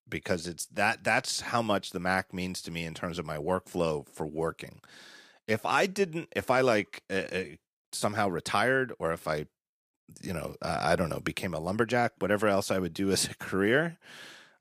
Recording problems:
none

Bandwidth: 15 kHz